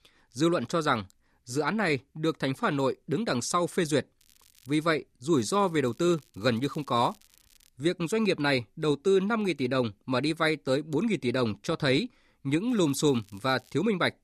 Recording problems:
crackling; faint; at 4 s, from 5.5 to 7.5 s and from 13 to 14 s; 30 dB below the speech

